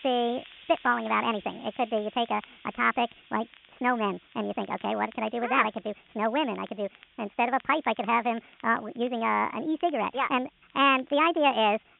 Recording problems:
high frequencies cut off; severe; nothing above 3.5 kHz
wrong speed and pitch; too fast and too high; 1.5 times normal speed
hiss; faint; throughout; 25 dB below the speech
crackle, like an old record; faint; 30 dB below the speech

